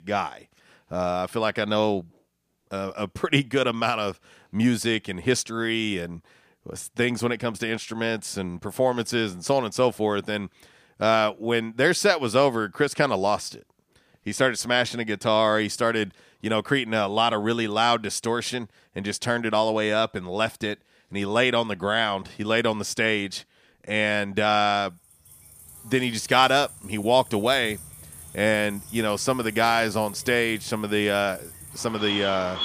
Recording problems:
animal sounds; noticeable; from 26 s on; 15 dB below the speech

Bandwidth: 15 kHz